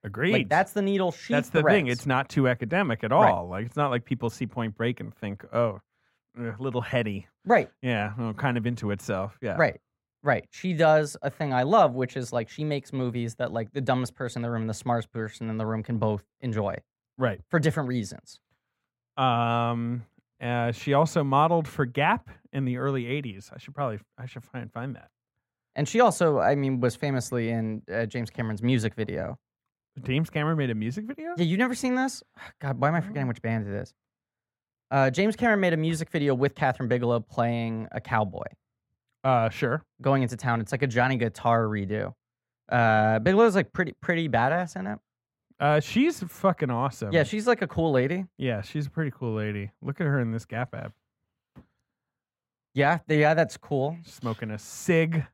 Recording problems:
muffled; slightly; fading above 2.5 kHz

